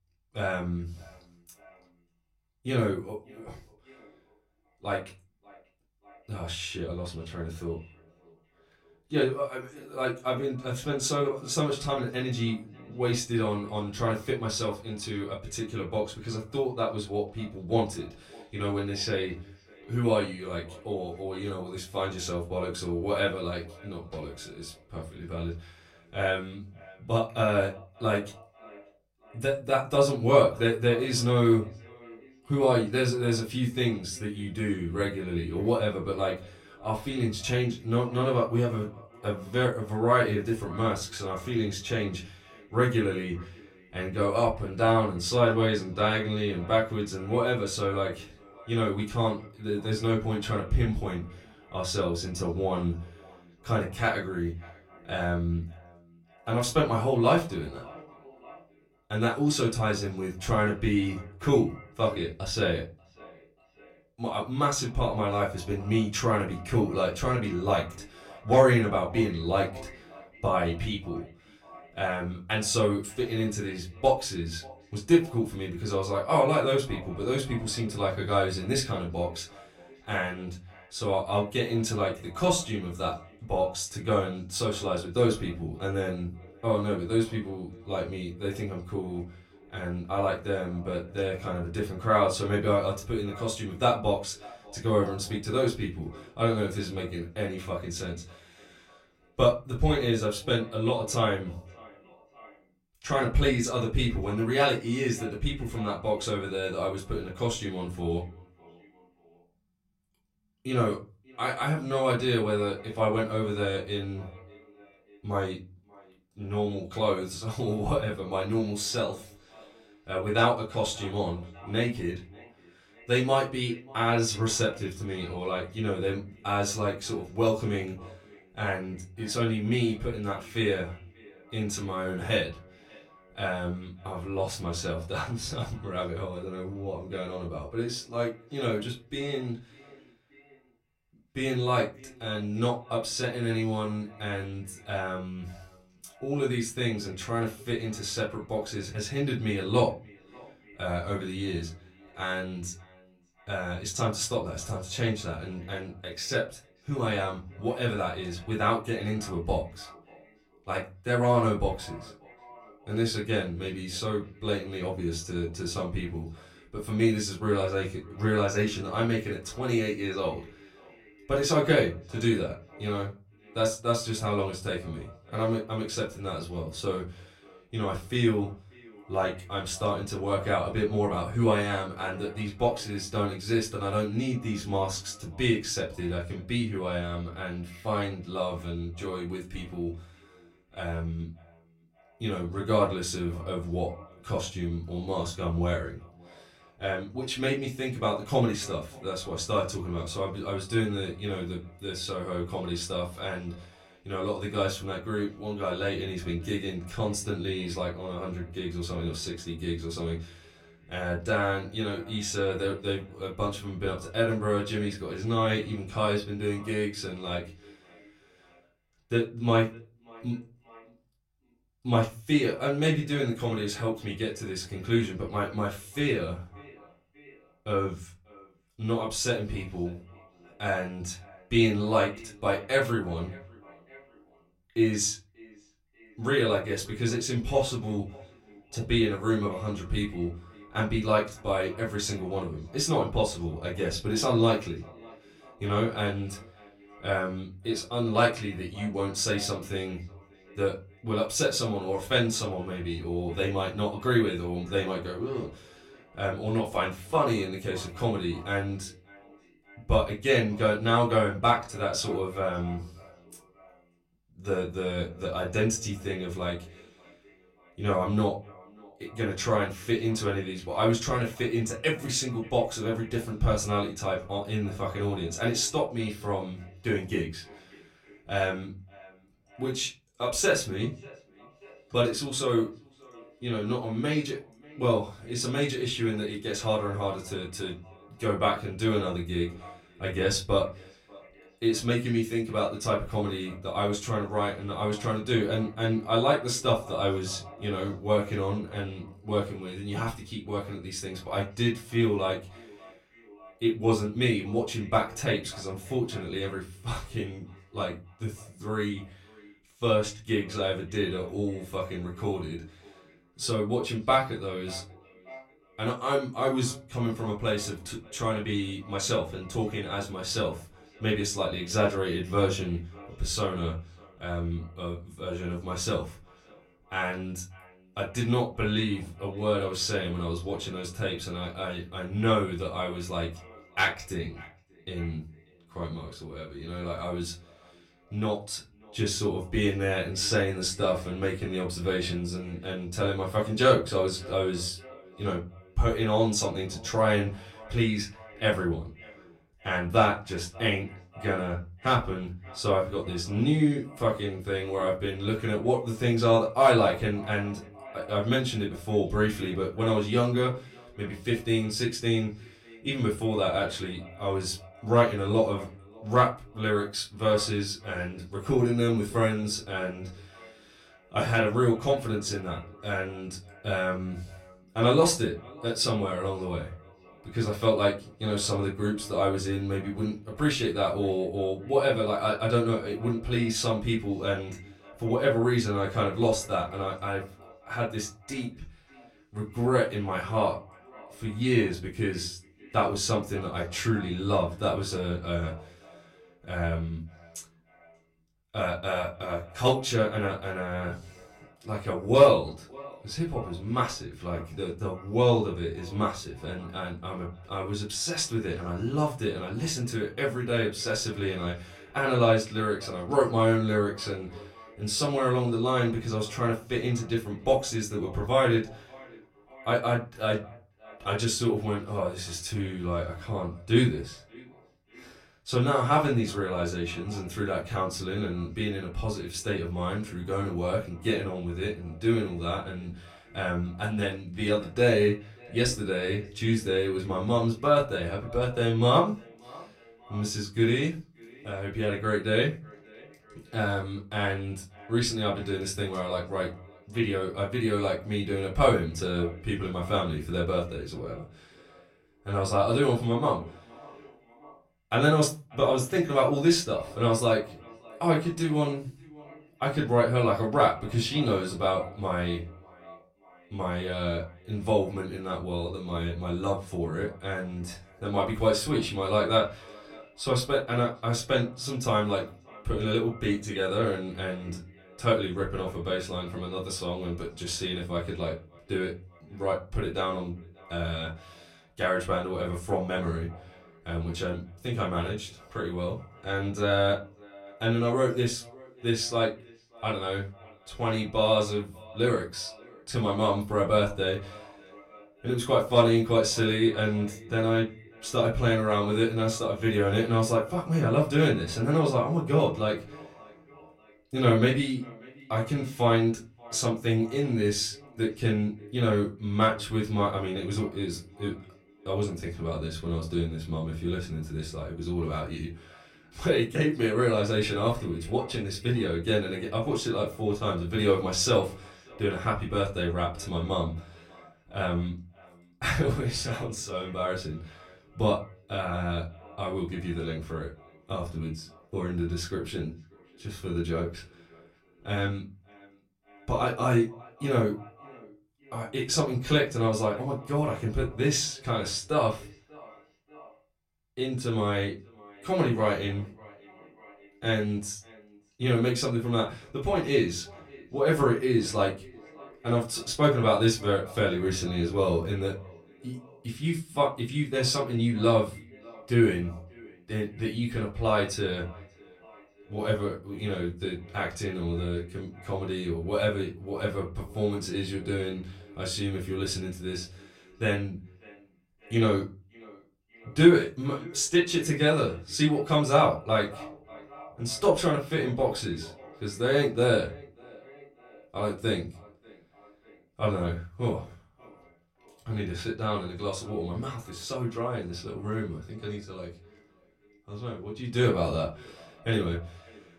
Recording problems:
off-mic speech; far
echo of what is said; faint; throughout; 590 ms later, 25 dB below the speech
room echo; very slight; dies away in 0.3 s

